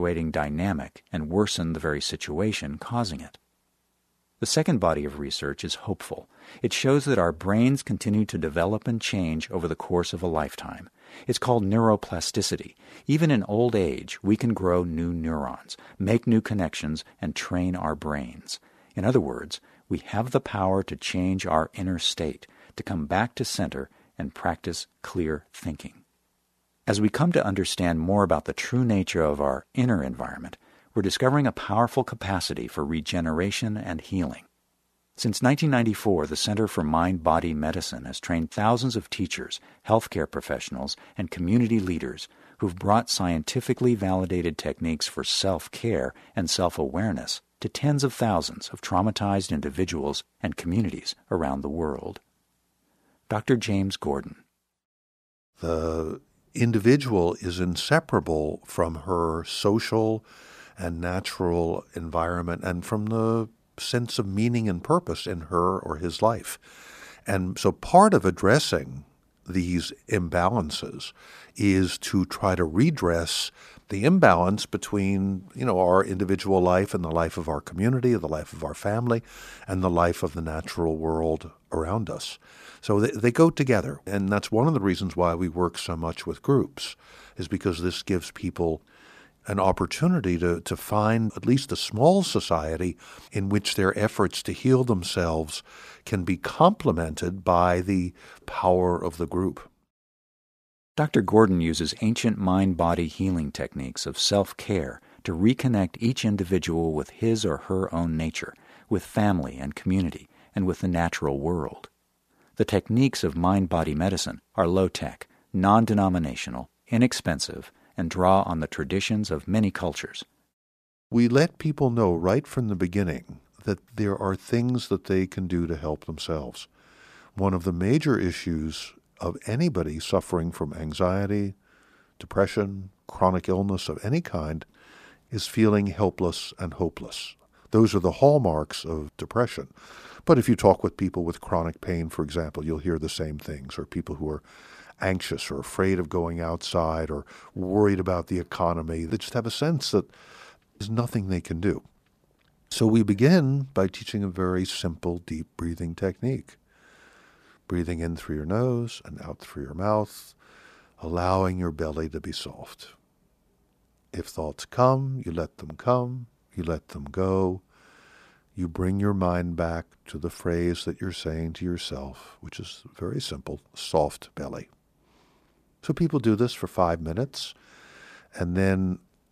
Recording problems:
abrupt cut into speech; at the start

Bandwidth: 14.5 kHz